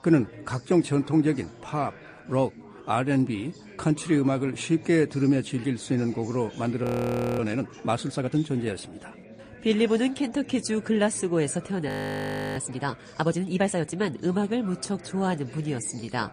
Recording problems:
garbled, watery; slightly; nothing above 15 kHz
chatter from many people; noticeable; throughout; 20 dB below the speech
audio freezing; at 7 s for 0.5 s and at 12 s for 0.5 s

